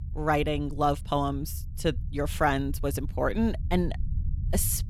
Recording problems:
low rumble; faint; throughout; 25 dB below the speech

